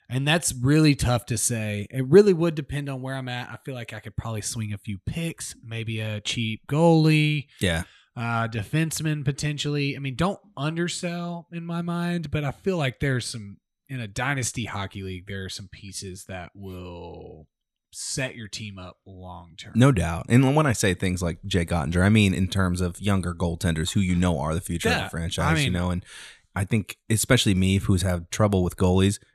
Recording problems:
none

